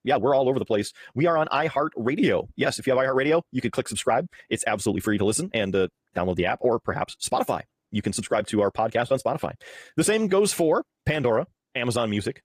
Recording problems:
wrong speed, natural pitch; too fast; 1.7 times normal speed
garbled, watery; slightly; nothing above 15 kHz

